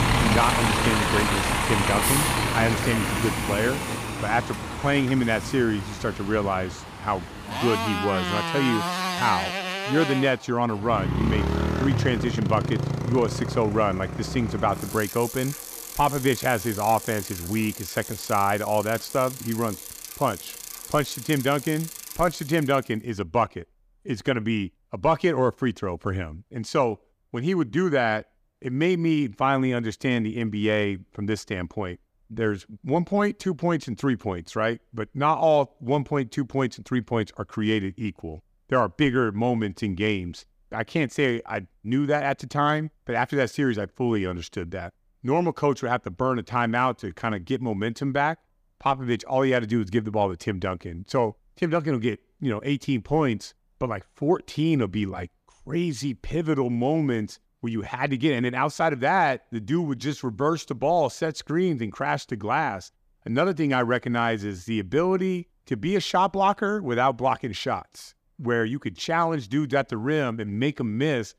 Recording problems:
traffic noise; loud; until 23 s; 2 dB below the speech

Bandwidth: 15 kHz